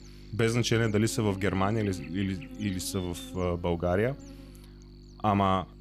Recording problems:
electrical hum; noticeable; throughout; 50 Hz, 20 dB below the speech

